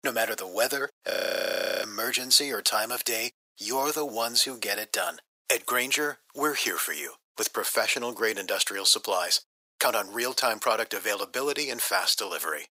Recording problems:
thin; very; fading below 450 Hz
audio freezing; at 1 s for 0.5 s

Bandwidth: 15.5 kHz